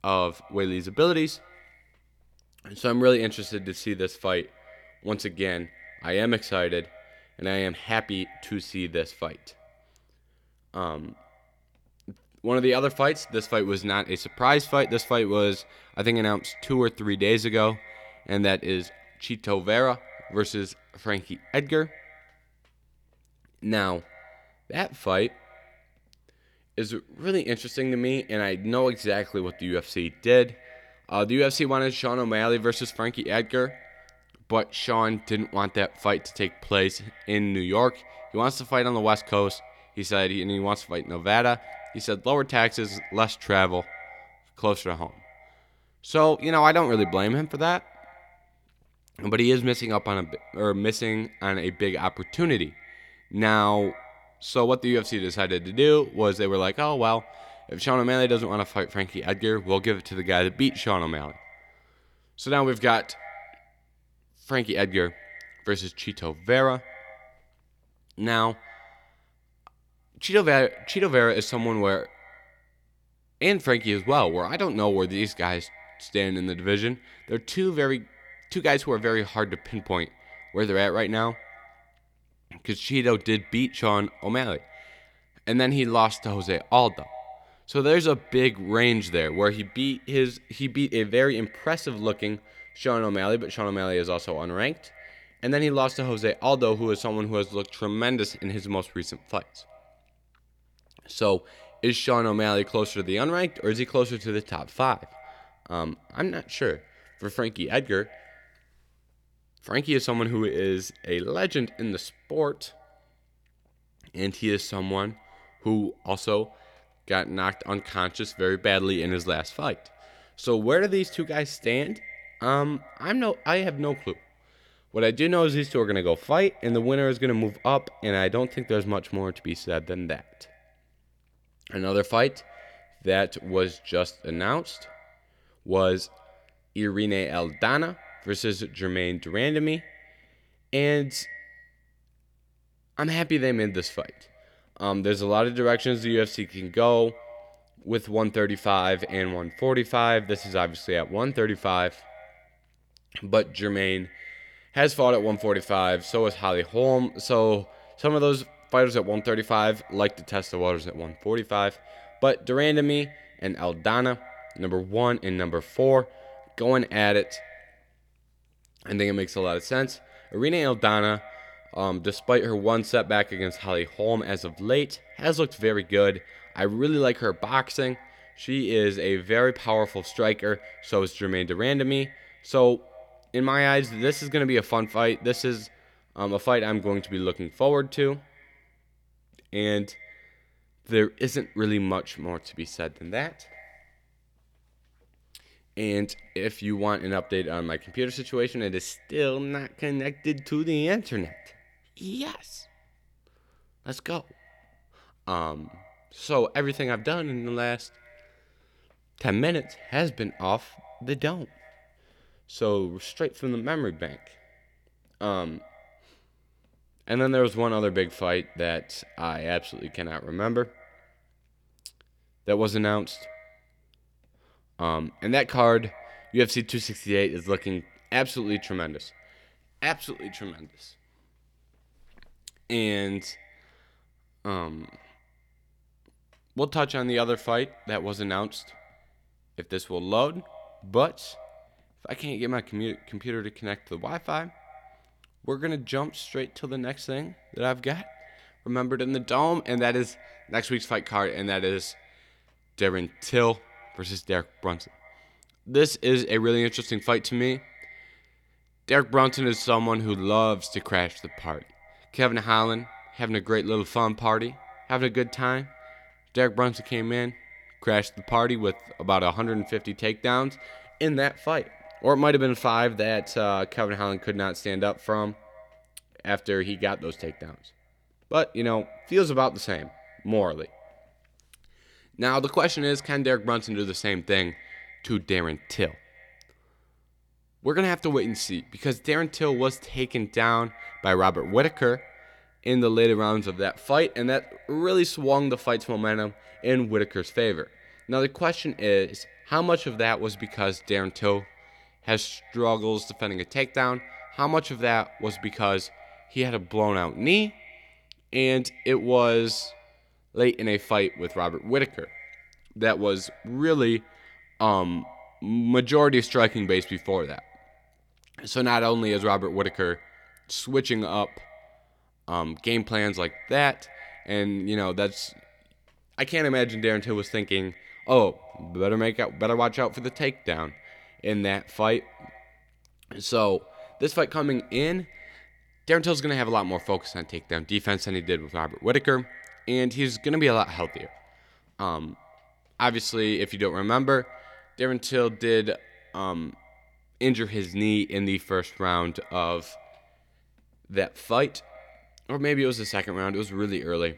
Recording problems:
echo of what is said; faint; throughout; 110 ms later, 25 dB below the speech

